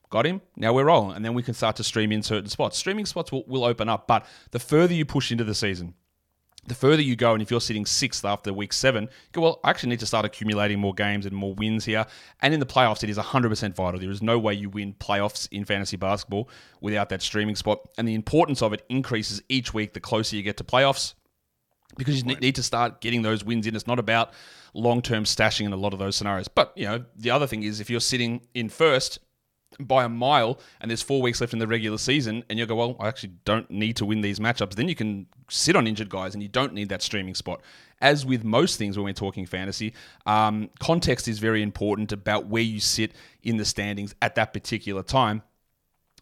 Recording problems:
none

